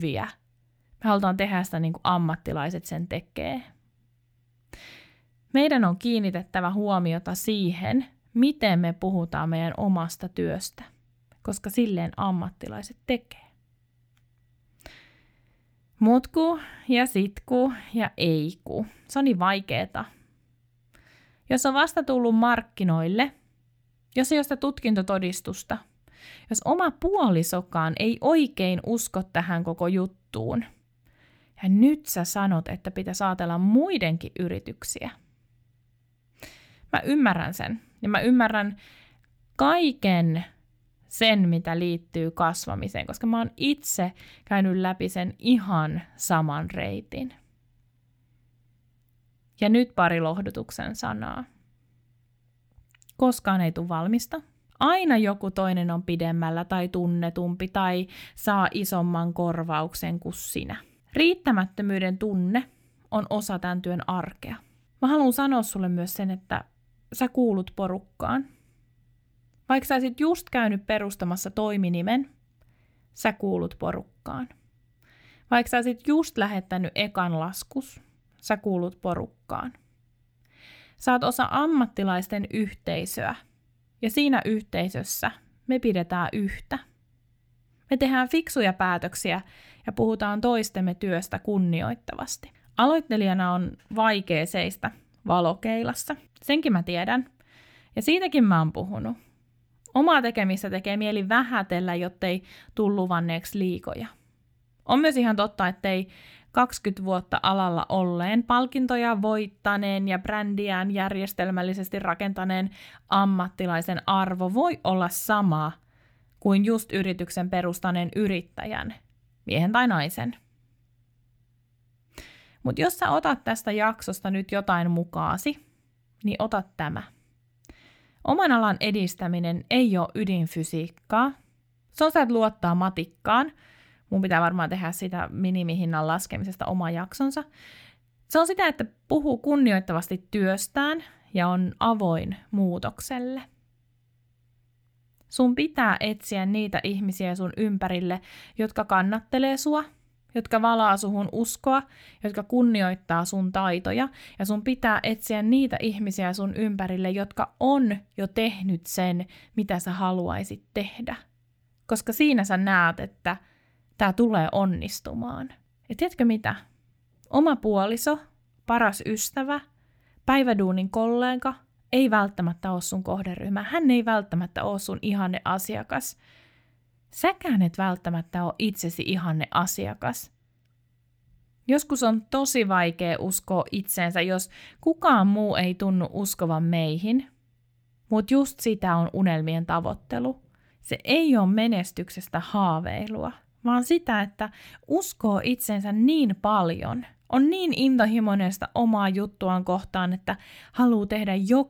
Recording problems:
abrupt cut into speech; at the start

